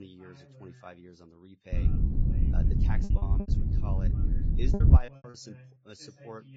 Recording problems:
garbled, watery; badly; nothing above 7.5 kHz
wind noise on the microphone; heavy; from 1.5 to 5 s; 5 dB above the speech
voice in the background; loud; throughout; 8 dB below the speech
choppy; very; 8% of the speech affected
abrupt cut into speech; at the start

